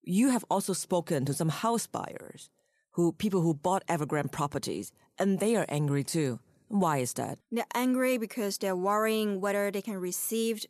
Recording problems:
none

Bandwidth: 13.5 kHz